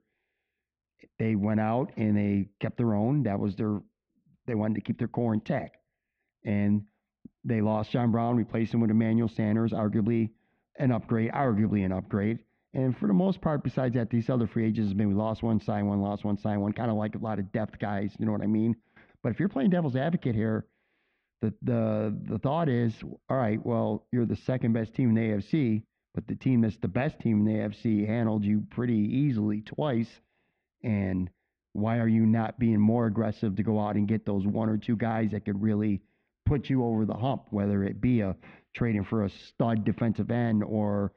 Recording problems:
muffled; very; fading above 3 kHz

